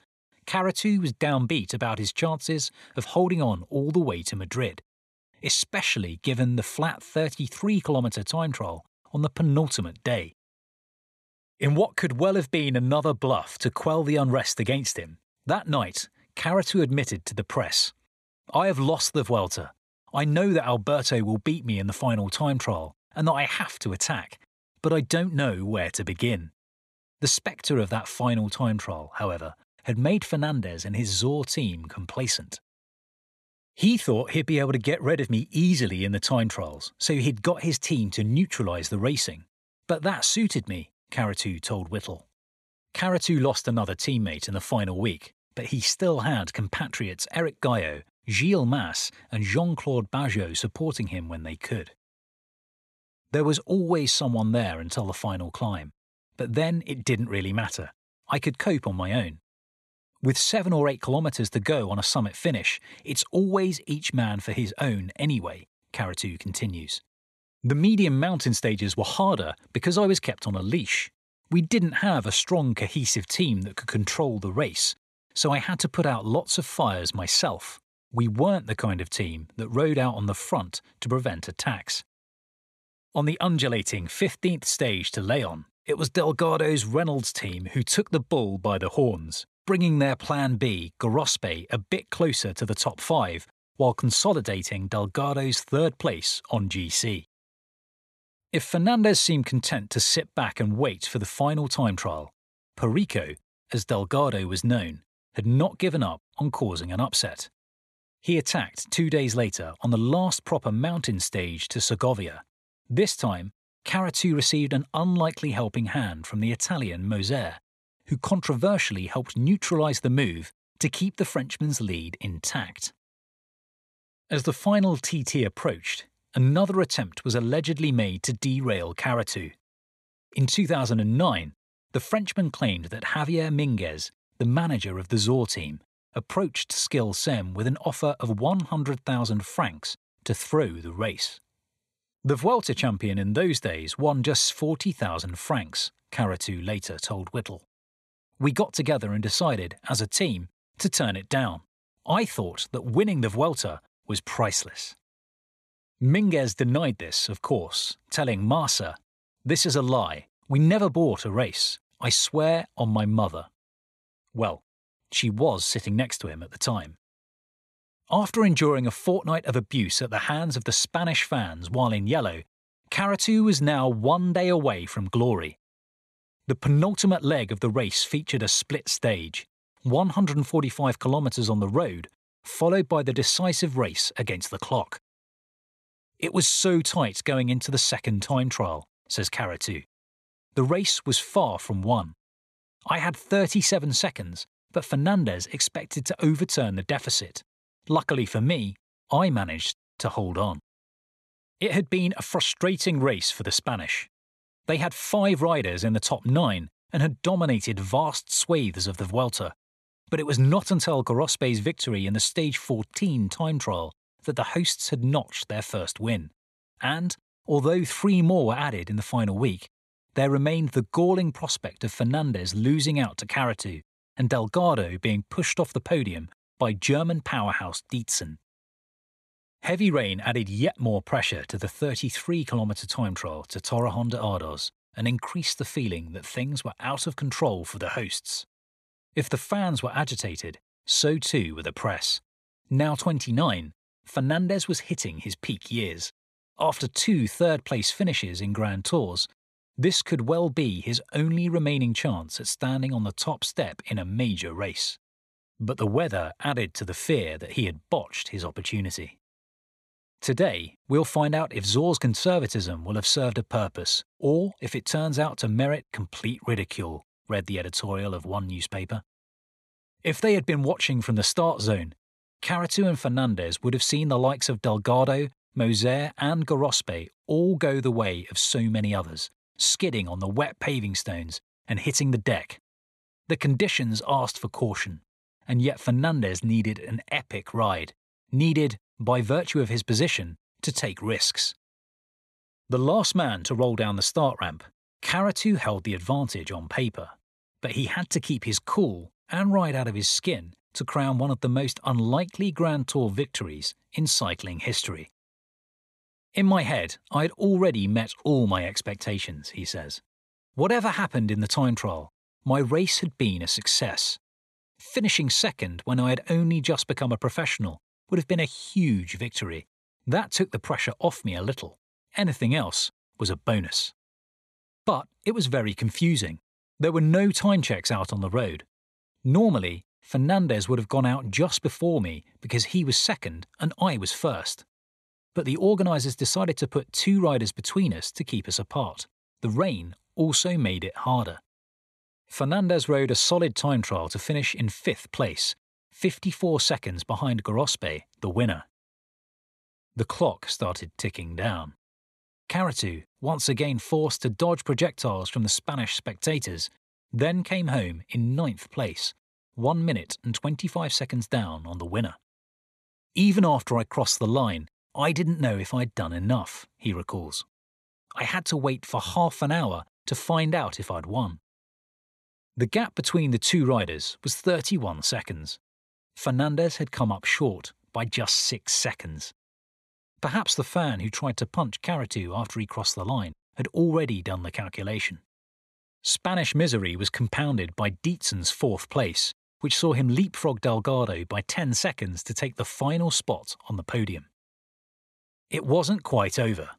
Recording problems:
none

